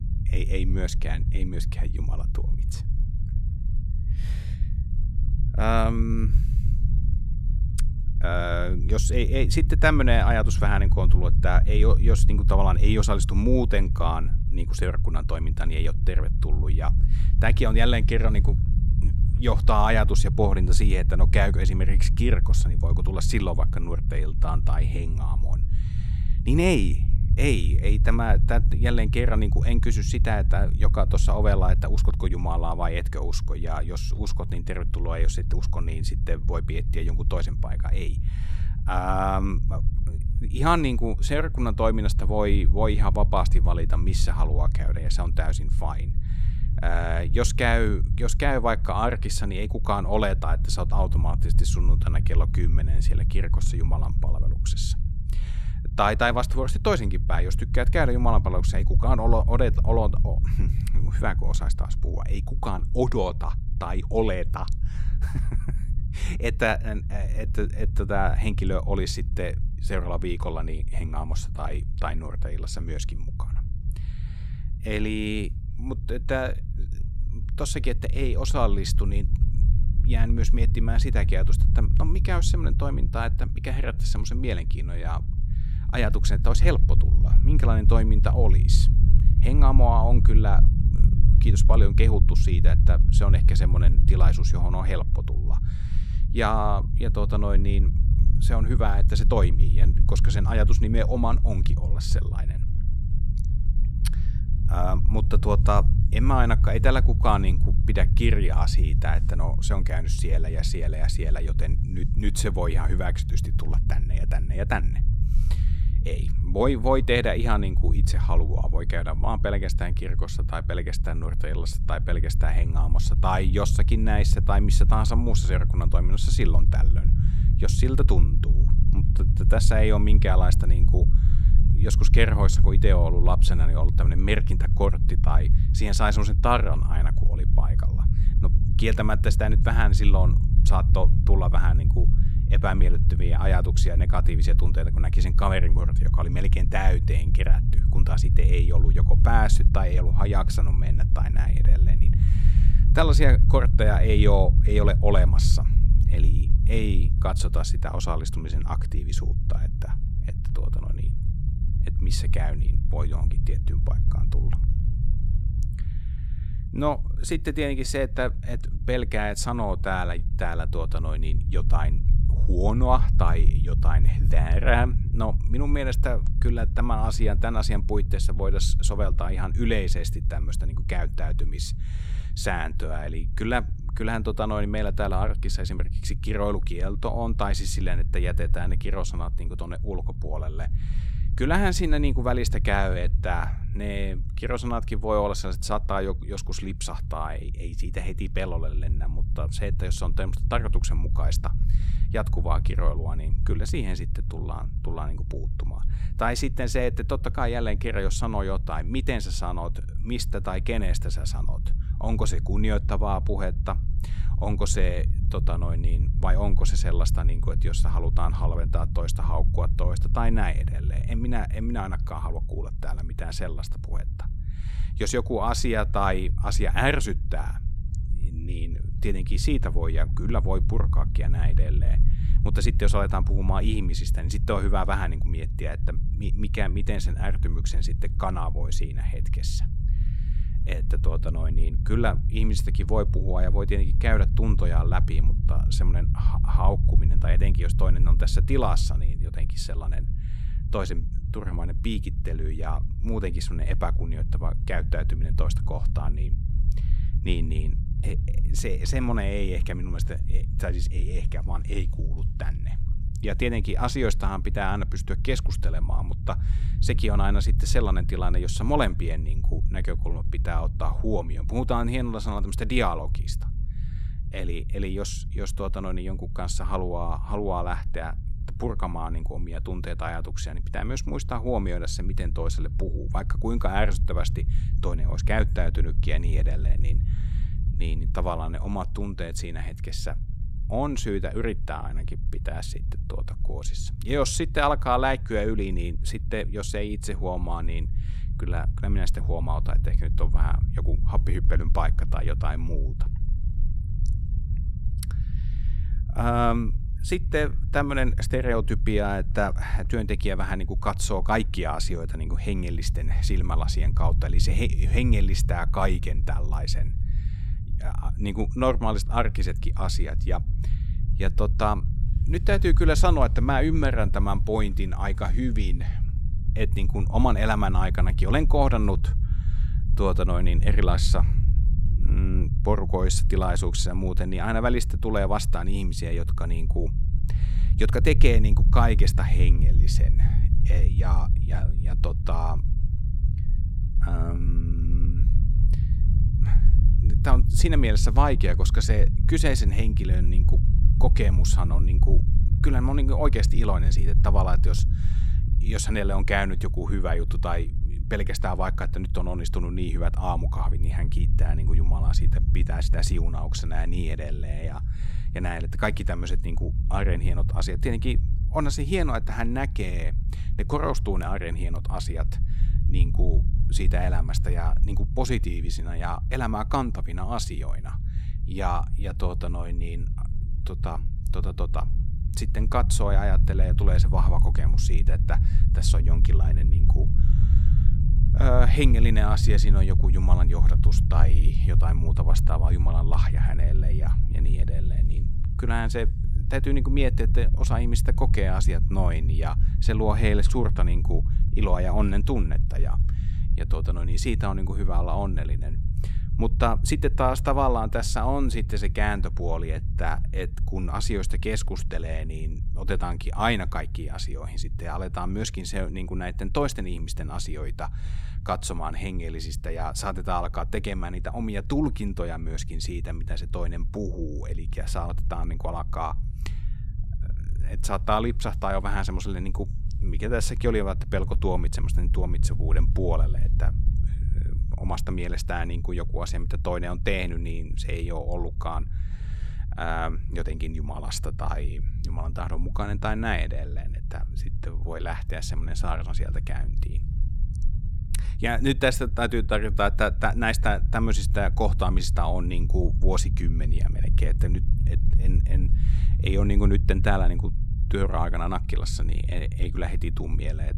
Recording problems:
low rumble; noticeable; throughout; 15 dB below the speech

